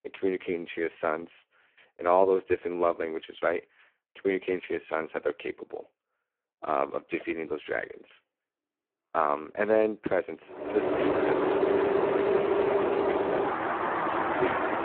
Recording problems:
phone-call audio; poor line
traffic noise; very loud; from 11 s on; 3 dB above the speech

